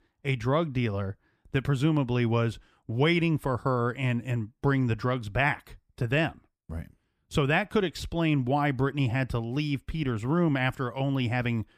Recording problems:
none

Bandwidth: 15 kHz